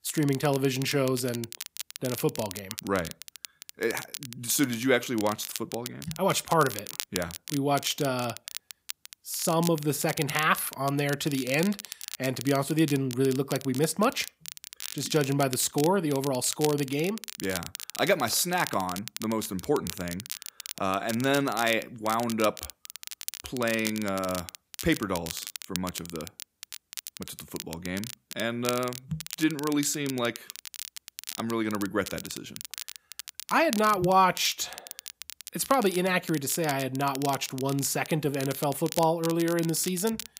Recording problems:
crackle, like an old record; noticeable; 10 dB below the speech

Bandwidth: 15.5 kHz